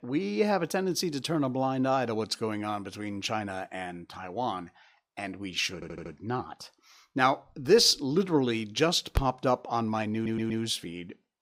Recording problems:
audio stuttering; at 5.5 s and at 10 s

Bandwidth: 15.5 kHz